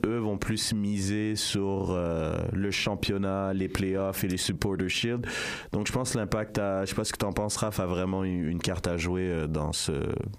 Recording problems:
squashed, flat; heavily

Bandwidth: 15 kHz